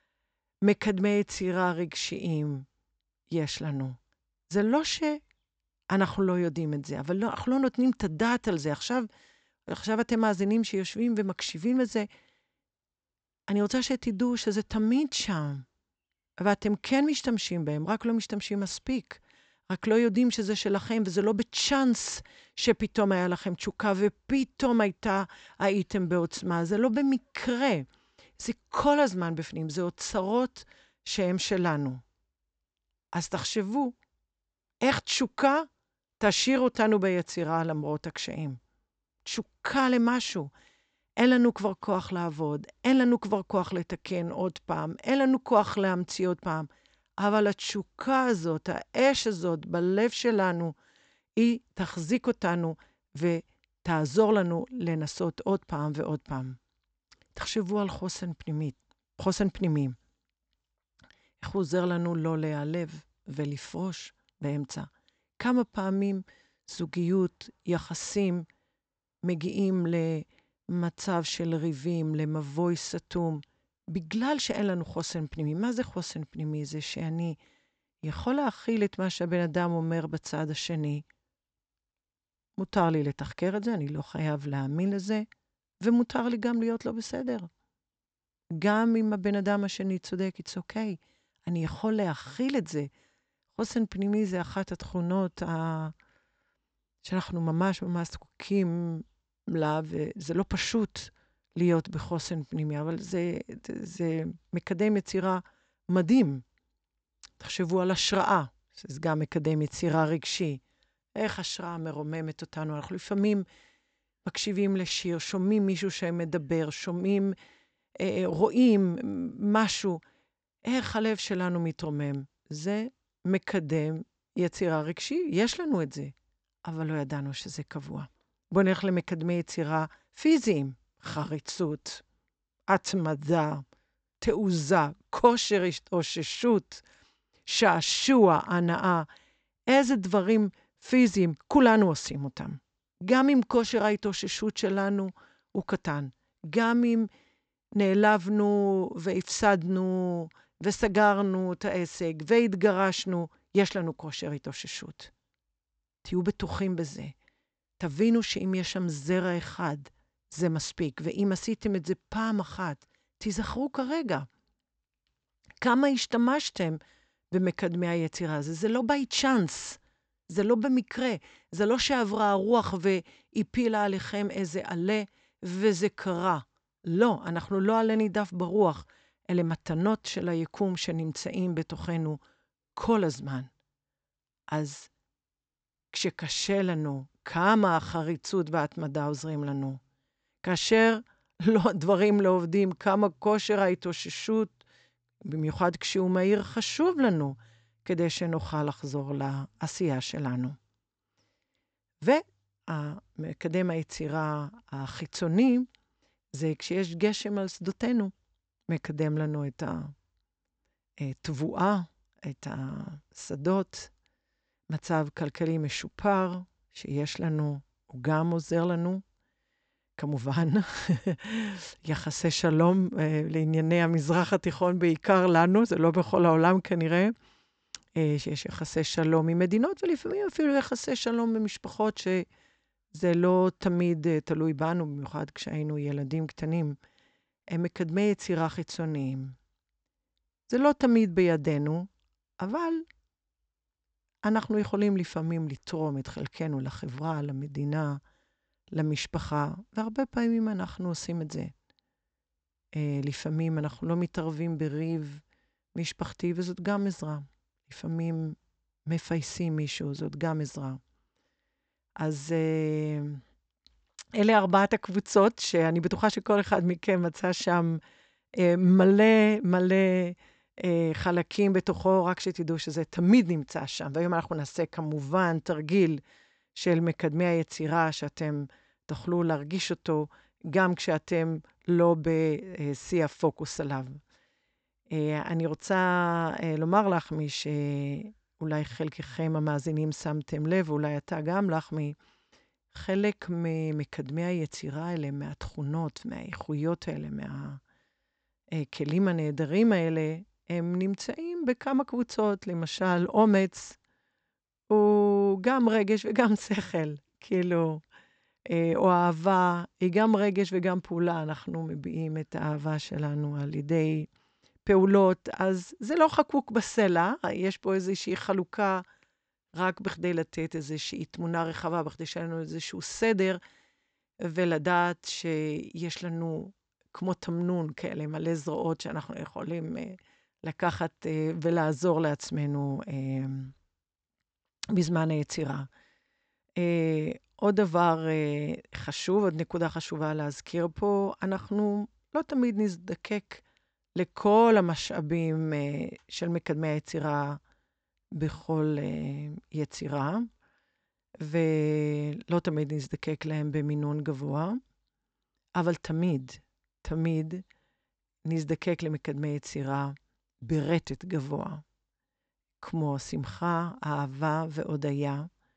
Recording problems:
high frequencies cut off; noticeable; nothing above 8 kHz

